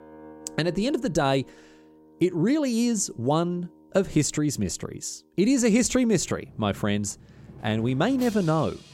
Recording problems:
background music; faint; throughout; 20 dB below the speech

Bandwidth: 16 kHz